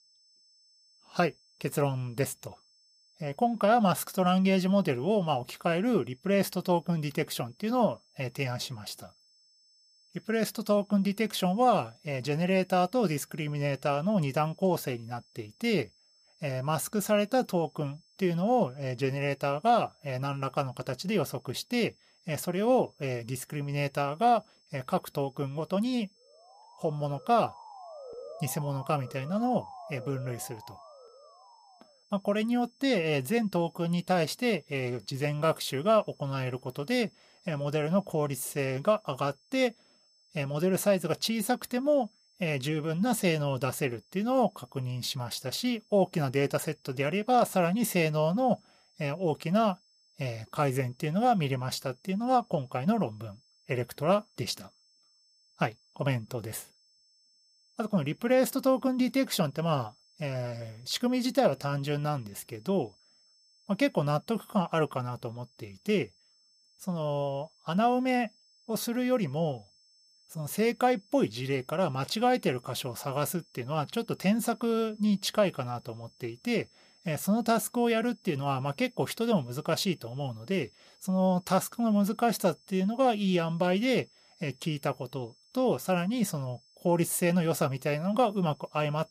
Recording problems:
high-pitched whine; faint; throughout; 5.5 kHz, 30 dB below the speech
siren; faint; from 26 to 32 s; peak 15 dB below the speech

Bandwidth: 14.5 kHz